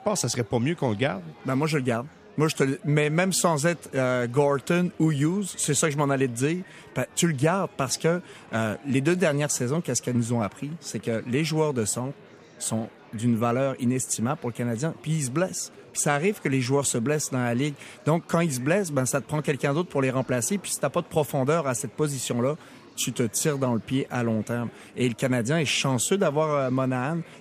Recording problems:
murmuring crowd; faint; throughout; 25 dB below the speech

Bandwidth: 14.5 kHz